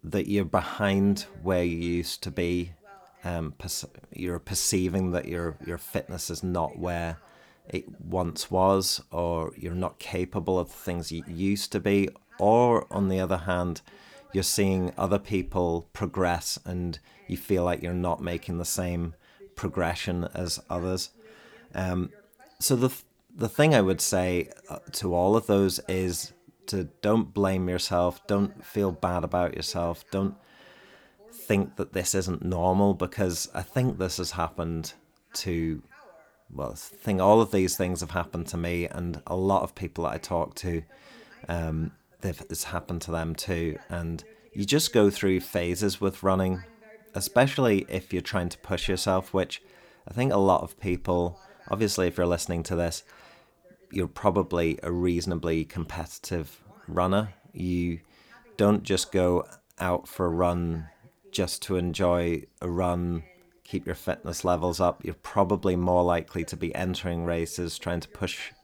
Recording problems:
voice in the background; faint; throughout; 30 dB below the speech

